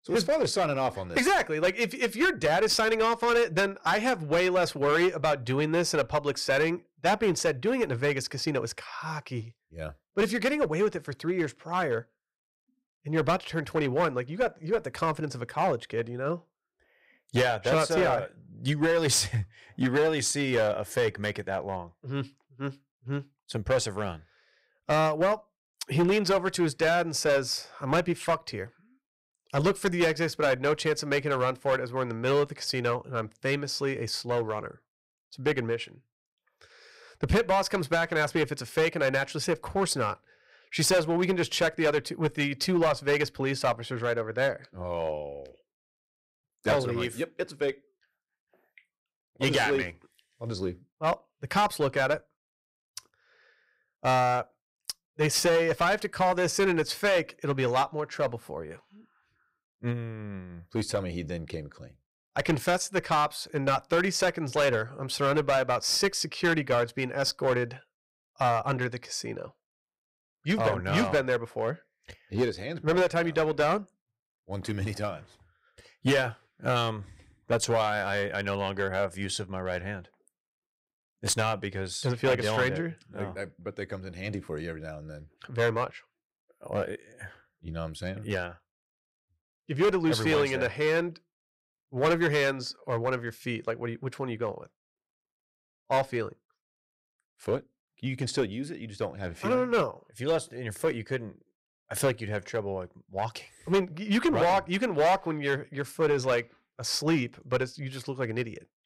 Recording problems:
distortion; slight; 5% of the sound clipped

